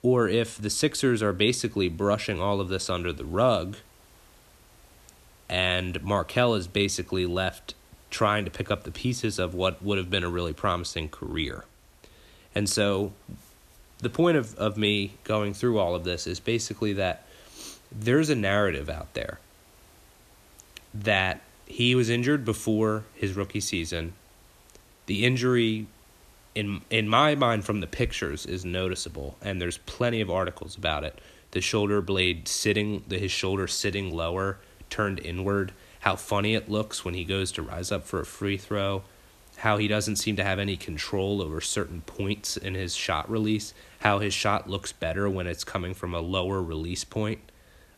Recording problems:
hiss; faint; throughout; 30 dB below the speech

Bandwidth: 14 kHz